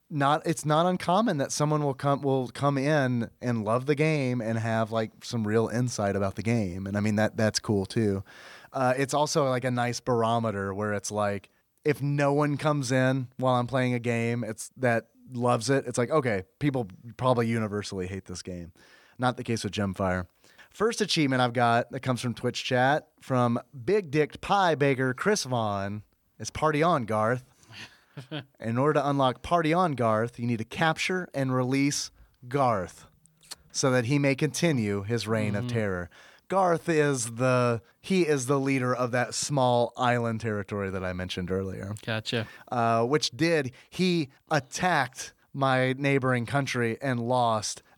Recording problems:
none

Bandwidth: 18.5 kHz